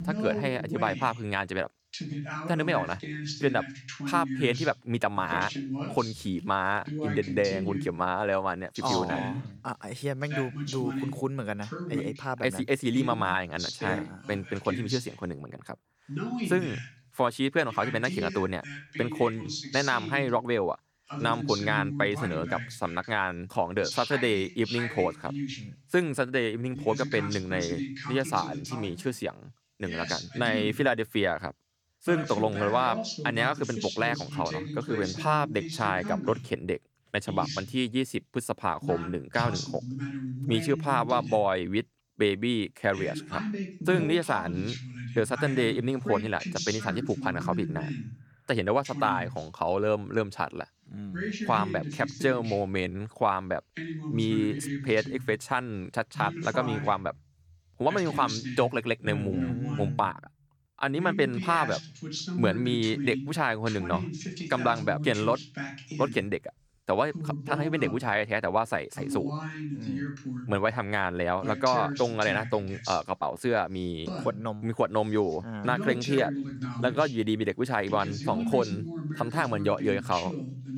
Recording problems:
voice in the background; loud; throughout; 7 dB below the speech

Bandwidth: 18.5 kHz